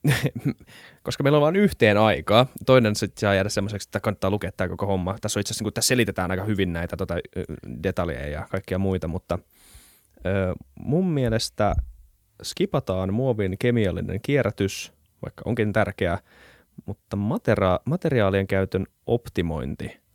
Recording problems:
none

